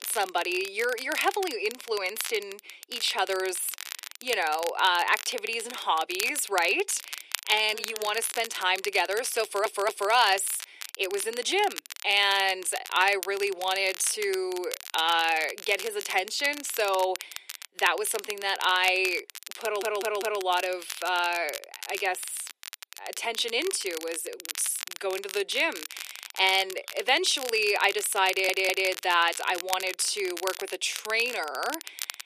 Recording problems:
thin; very; fading below 350 Hz
crackle, like an old record; noticeable; 10 dB below the speech
audio stuttering; at 9.5 s, at 20 s and at 28 s

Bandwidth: 14.5 kHz